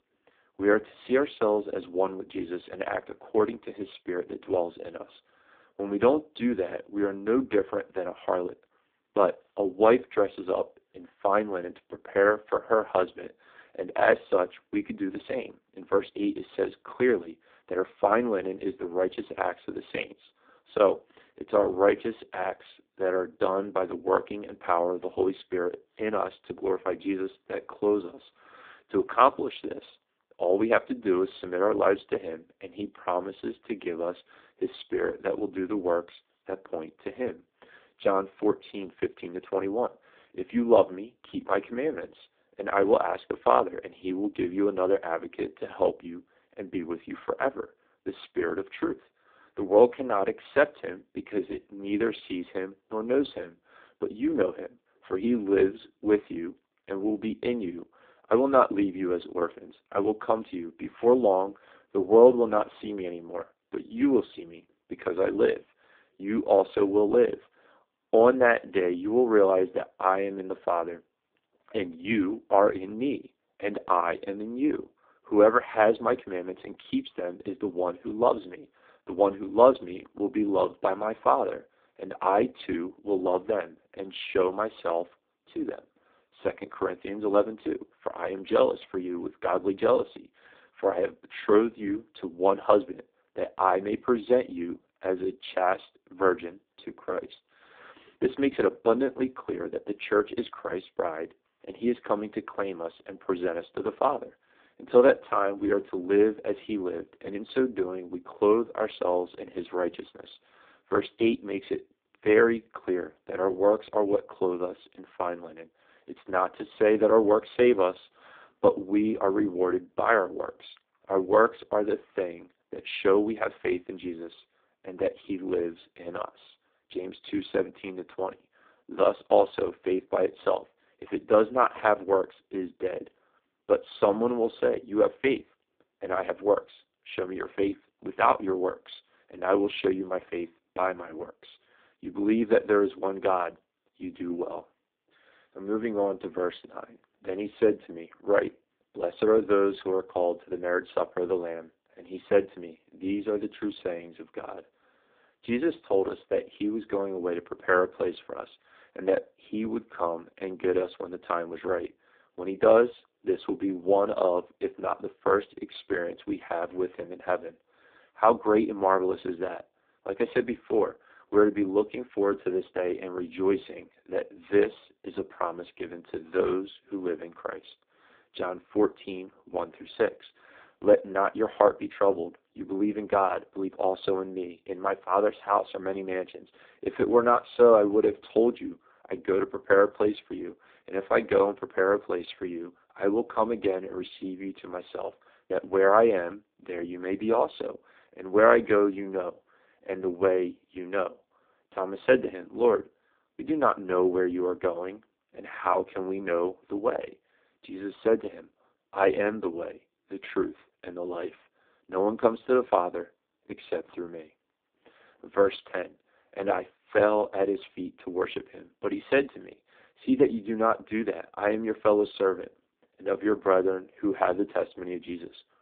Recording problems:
phone-call audio; poor line; nothing above 3.5 kHz

